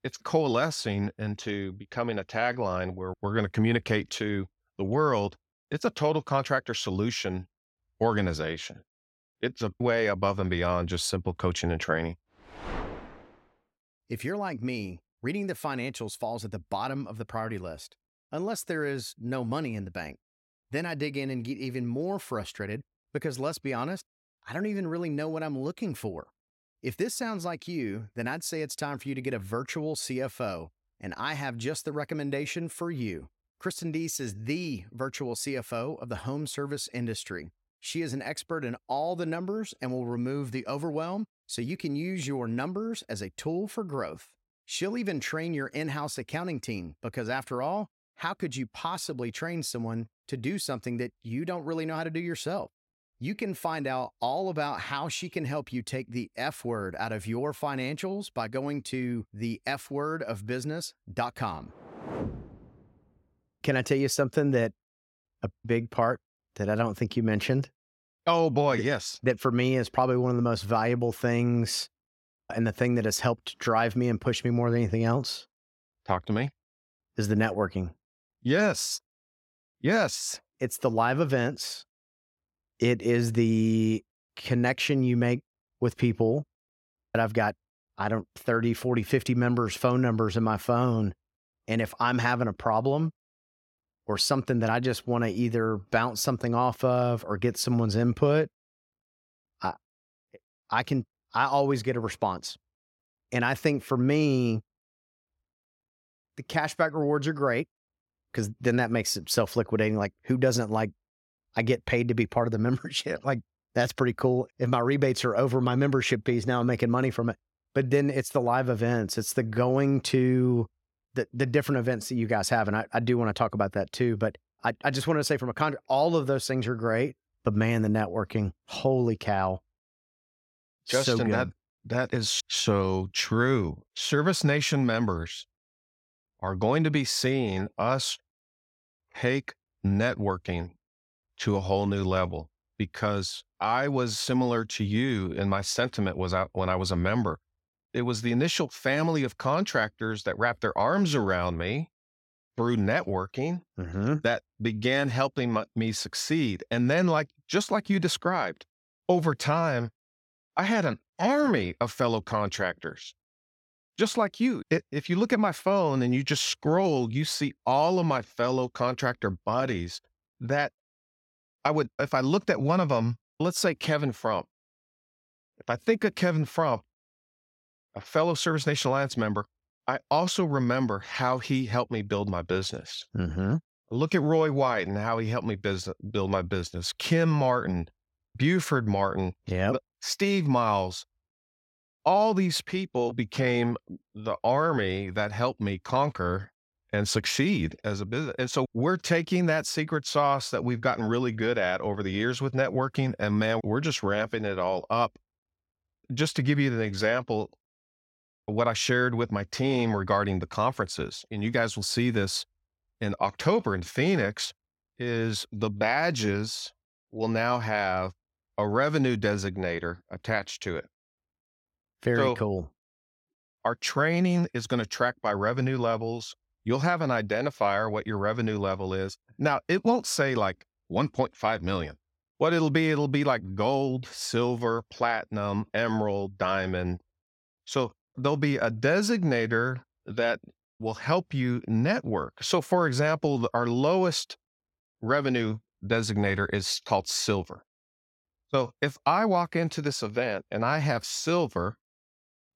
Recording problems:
none

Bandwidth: 16.5 kHz